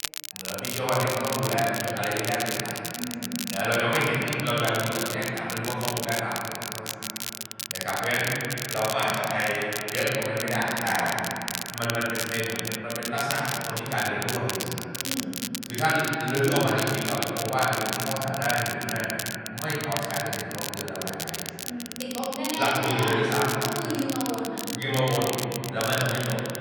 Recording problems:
room echo; strong; dies away in 2.7 s
off-mic speech; far
echo of what is said; faint; throughout; 380 ms later, 20 dB below the speech
crackle, like an old record; loud; 5 dB below the speech
voice in the background; faint; throughout; 30 dB below the speech

